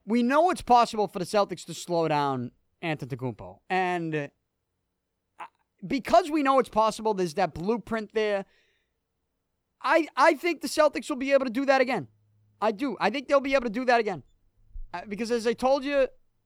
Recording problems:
none

